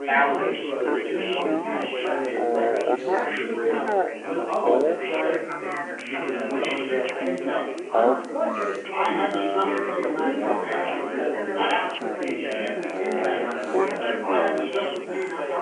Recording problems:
wrong speed and pitch; too slow and too low; 0.5 times normal speed
phone-call audio; nothing above 3 kHz
chatter from many people; very loud; throughout; 3 dB above the speech
hiss; faint; throughout; 25 dB below the speech
crackle, like an old record; faint; 25 dB below the speech

